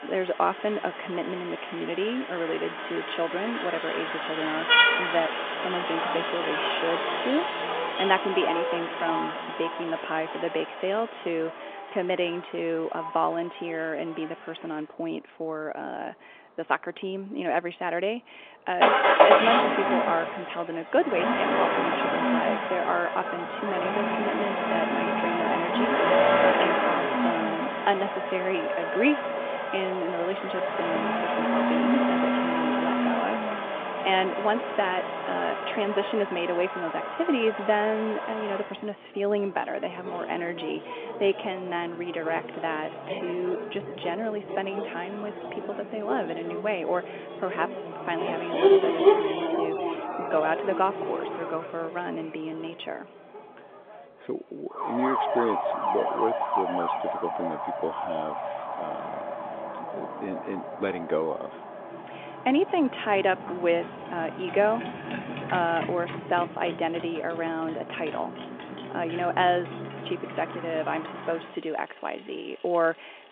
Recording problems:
phone-call audio
traffic noise; very loud; throughout; 2 dB above the speech

